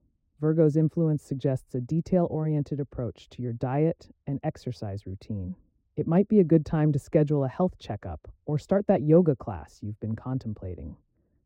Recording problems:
muffled; very; fading above 1 kHz

